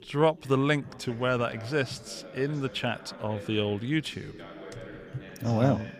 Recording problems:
background chatter; noticeable; throughout; 2 voices, 15 dB below the speech

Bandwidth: 15 kHz